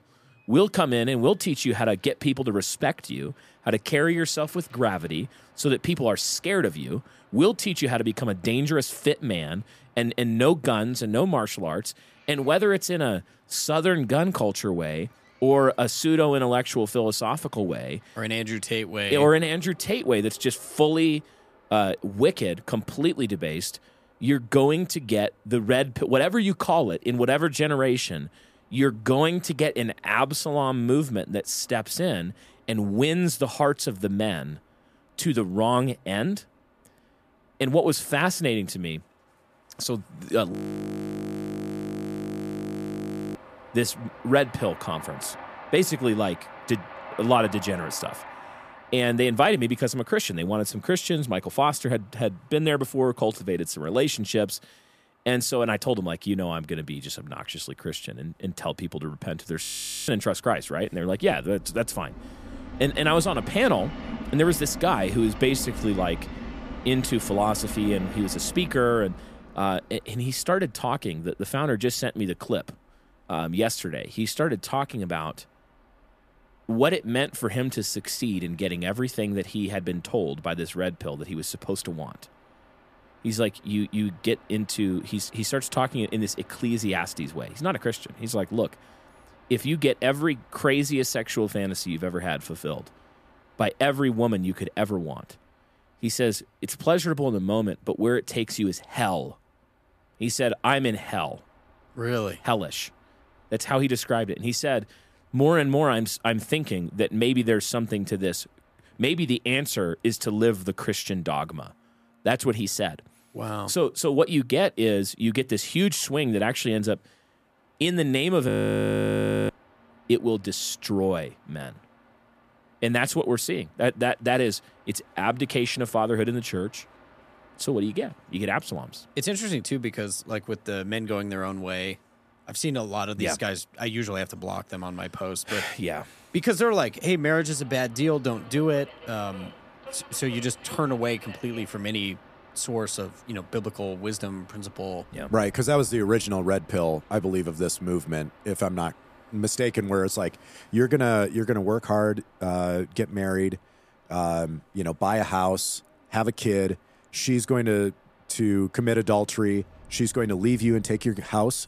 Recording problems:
train or aircraft noise; noticeable; throughout; 20 dB below the speech
audio freezing; at 41 s for 3 s, at 1:00 and at 1:58 for 1 s

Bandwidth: 14.5 kHz